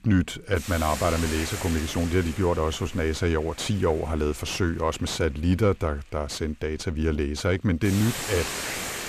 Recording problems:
distortion; slight; 10 dB below the speech
hiss; loud; throughout; 7 dB below the speech

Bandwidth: 14.5 kHz